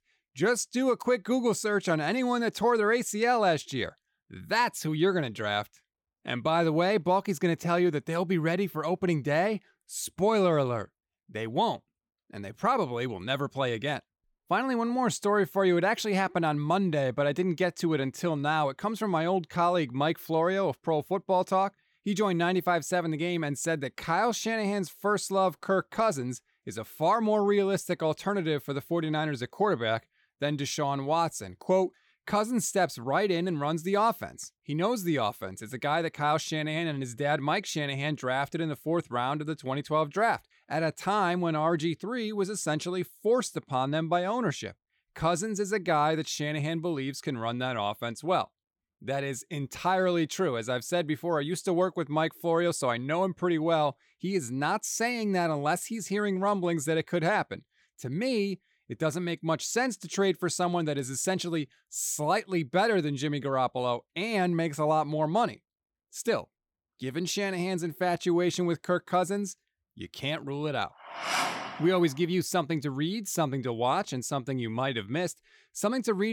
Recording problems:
abrupt cut into speech; at the end

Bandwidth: 18 kHz